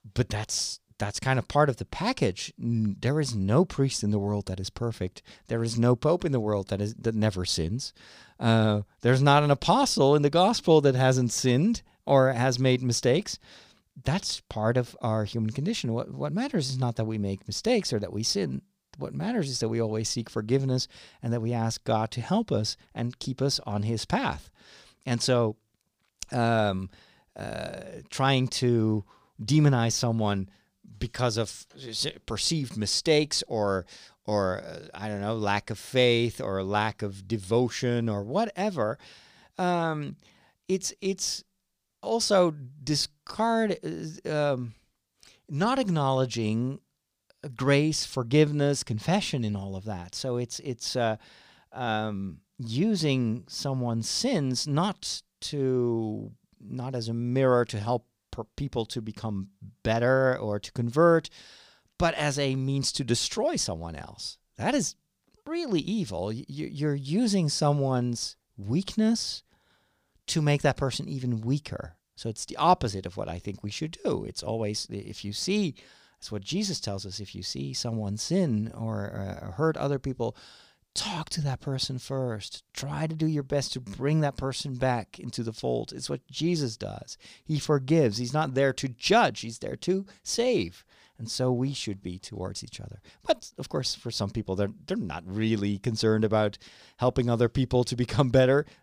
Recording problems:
none

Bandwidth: 15 kHz